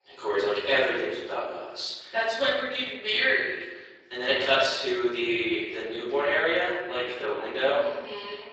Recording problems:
room echo; strong; dies away in 1.1 s
off-mic speech; far
thin; very; fading below 350 Hz
garbled, watery; slightly; nothing above 7.5 kHz

